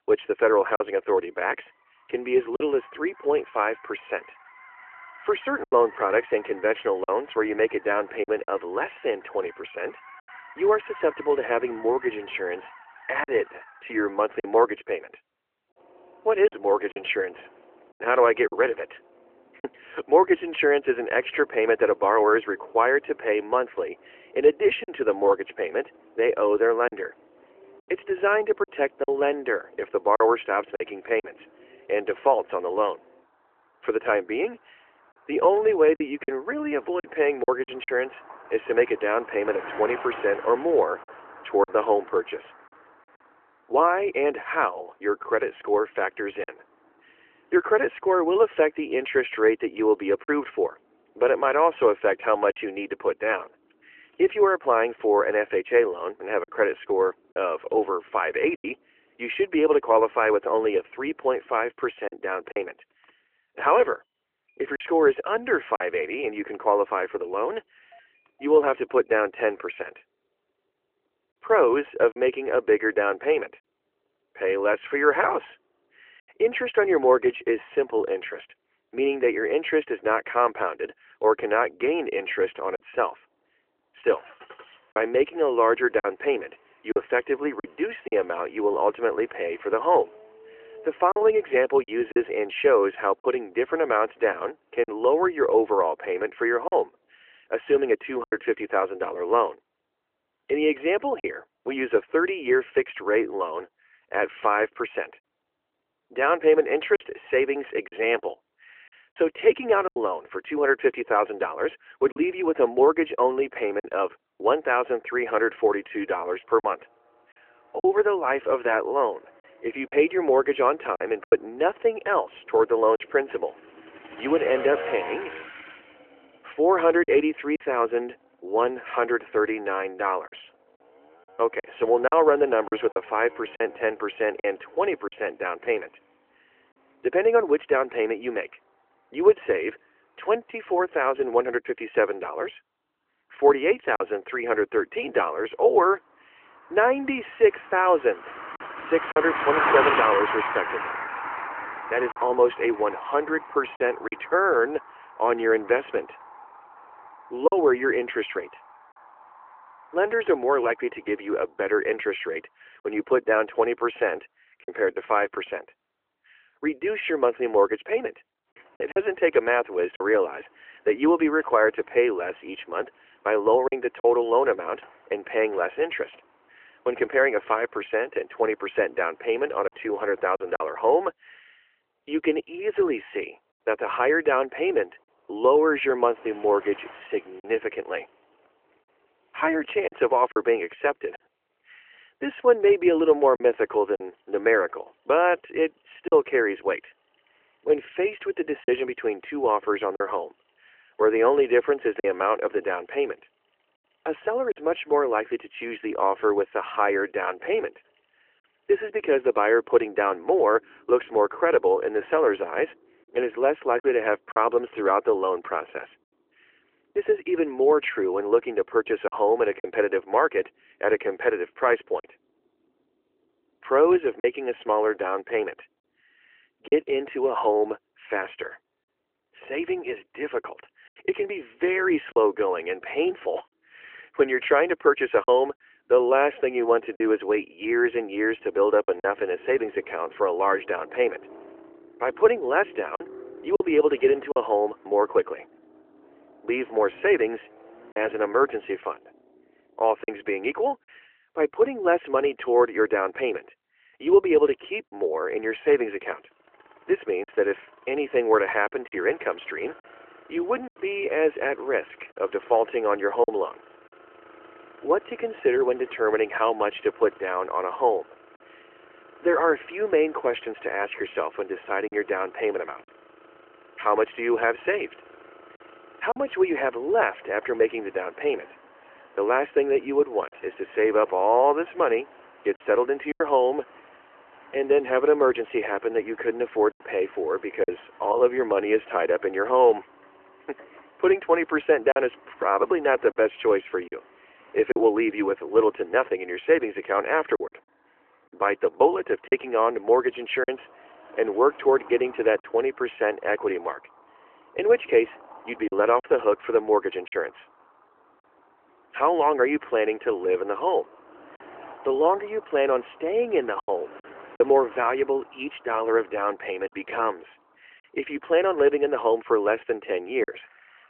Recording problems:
phone-call audio; nothing above 3 kHz
traffic noise; noticeable; throughout; 15 dB below the speech
choppy; occasionally; 2% of the speech affected

